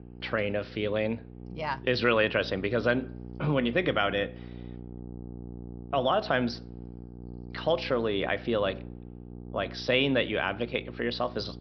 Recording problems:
high frequencies cut off; noticeable; nothing above 5.5 kHz
electrical hum; faint; throughout; 60 Hz, 20 dB below the speech

